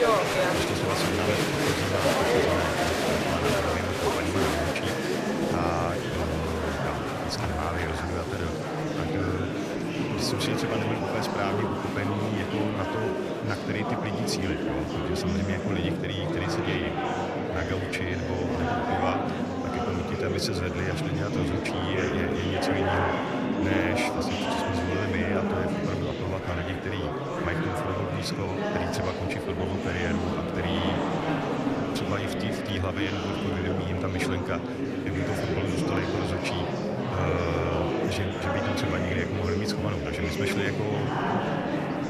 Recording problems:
murmuring crowd; very loud; throughout; 4 dB above the speech

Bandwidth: 14.5 kHz